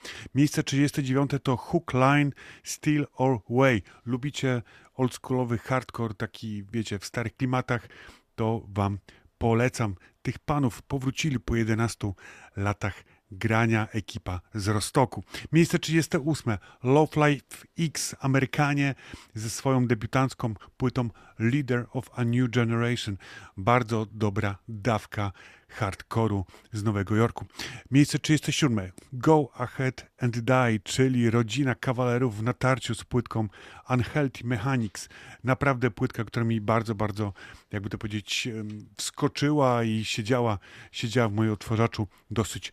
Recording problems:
none

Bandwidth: 14.5 kHz